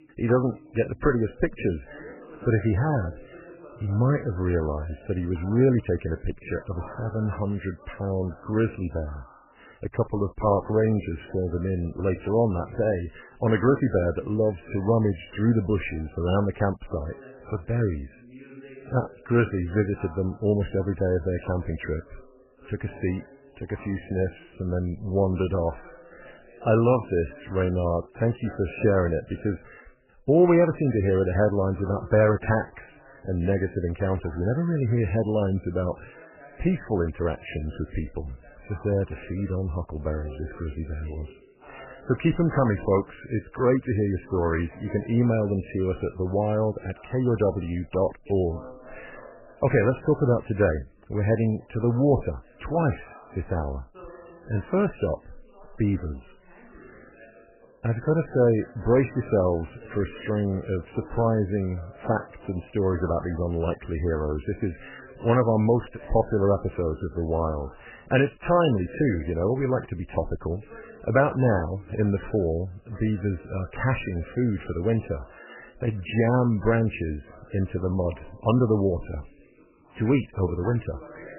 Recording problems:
garbled, watery; badly; nothing above 3 kHz
voice in the background; faint; throughout; 25 dB below the speech

